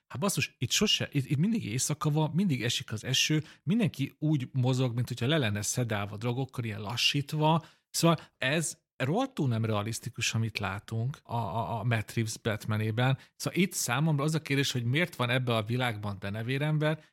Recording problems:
none

